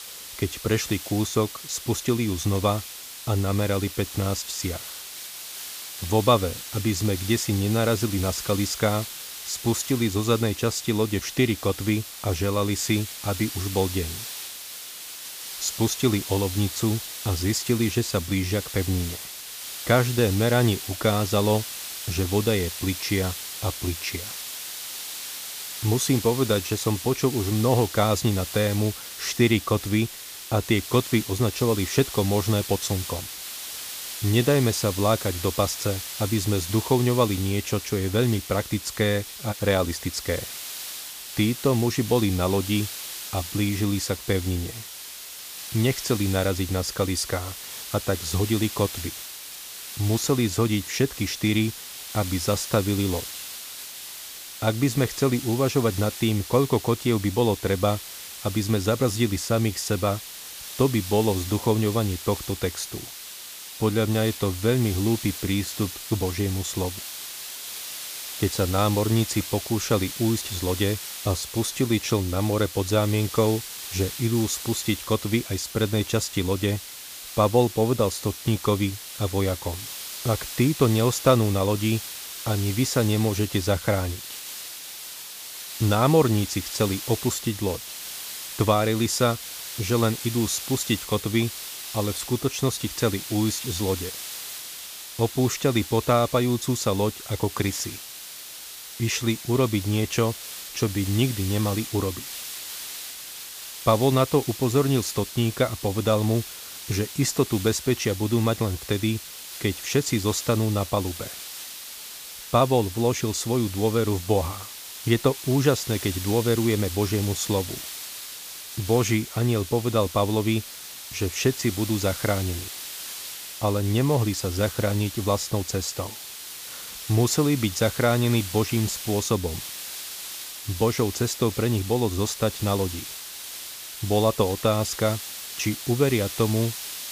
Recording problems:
hiss; loud; throughout; 9 dB below the speech

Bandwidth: 15 kHz